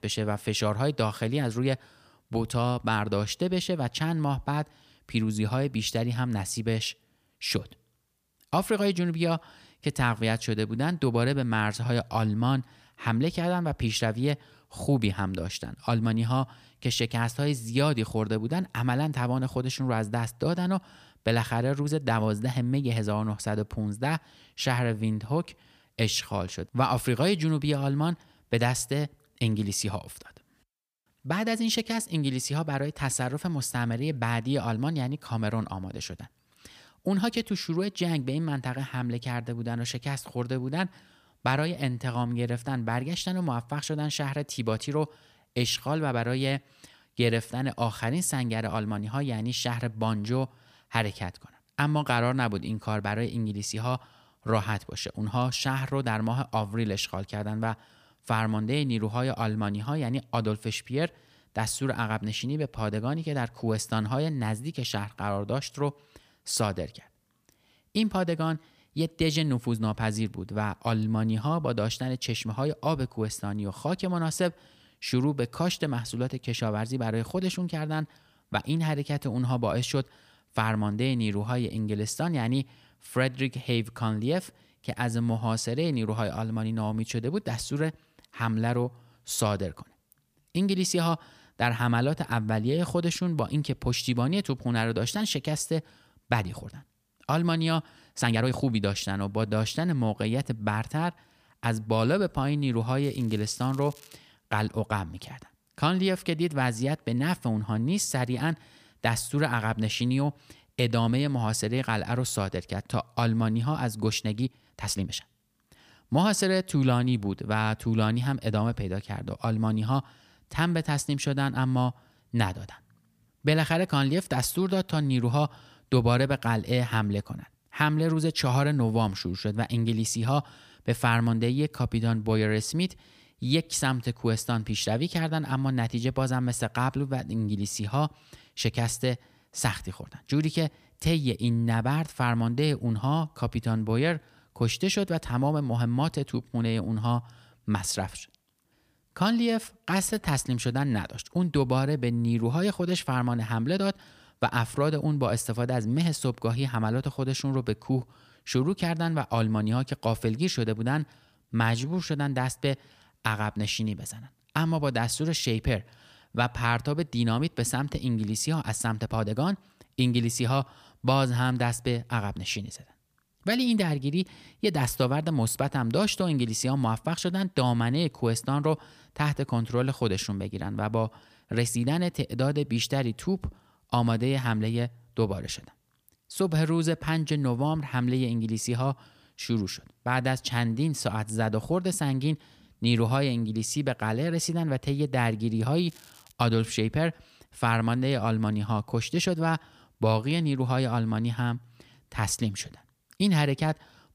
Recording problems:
crackling; faint; from 1:43 to 1:44 and at 3:16; 25 dB below the speech
uneven, jittery; strongly; from 1:36 to 3:02

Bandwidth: 15 kHz